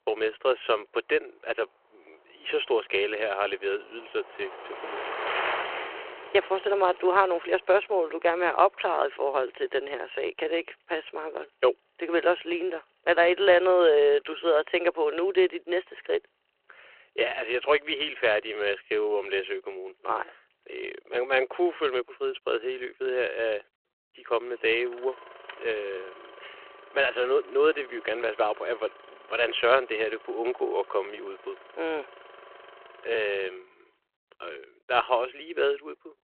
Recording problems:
phone-call audio
traffic noise; noticeable; throughout; 15 dB below the speech

